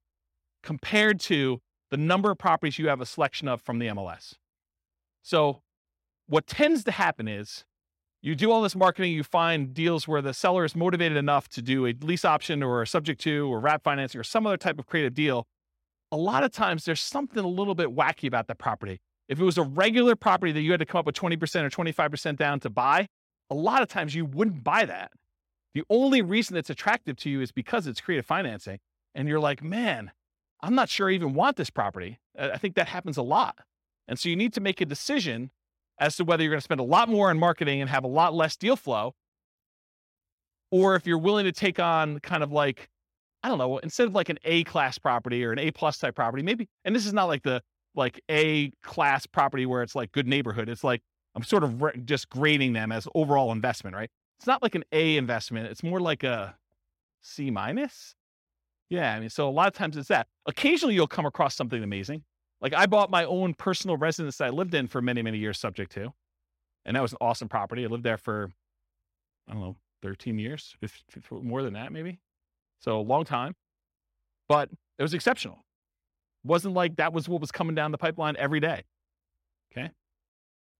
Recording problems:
none

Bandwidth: 16 kHz